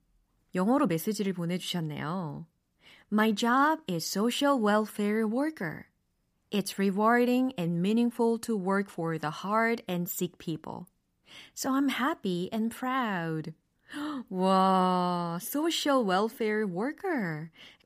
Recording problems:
none

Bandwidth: 15 kHz